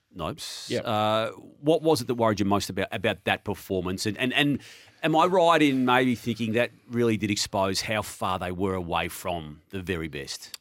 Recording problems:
none

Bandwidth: 16 kHz